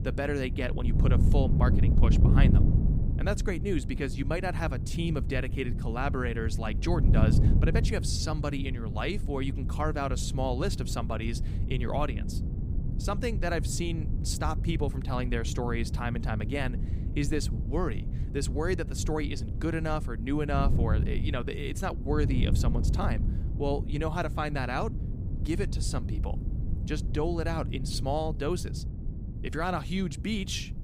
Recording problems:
wind noise on the microphone; heavy; 9 dB below the speech

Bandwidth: 15.5 kHz